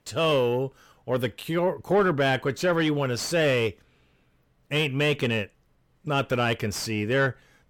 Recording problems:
distortion; slight; 10 dB below the speech

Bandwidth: 17.5 kHz